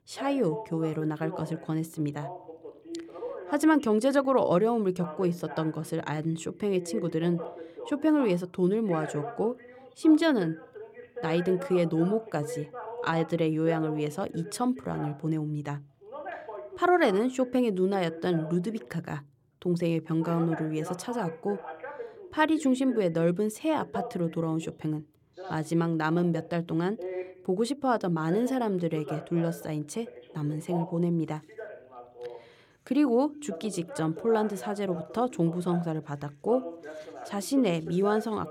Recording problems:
voice in the background; noticeable; throughout; 15 dB below the speech

